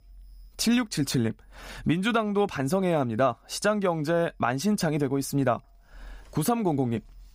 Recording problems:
none

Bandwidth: 15.5 kHz